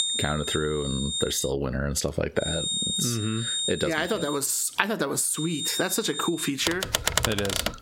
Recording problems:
squashed, flat; heavily
high-pitched whine; loud; until 1.5 s, from 2.5 to 4.5 s and from 5.5 to 6.5 s; 3.5 kHz, 3 dB below the speech
keyboard typing; loud; from 6.5 s on; peak 4 dB above the speech

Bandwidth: 16 kHz